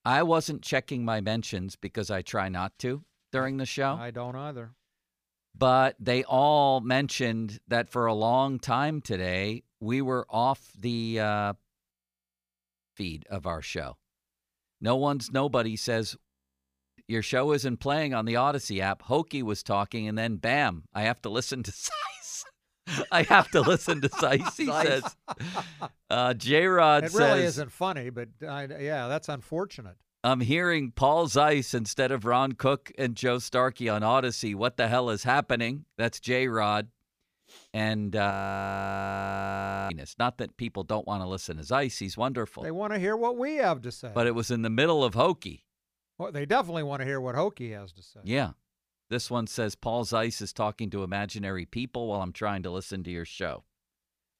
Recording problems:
audio freezing; at 12 s for 1 s, at 16 s for 0.5 s and at 38 s for 1.5 s

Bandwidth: 15 kHz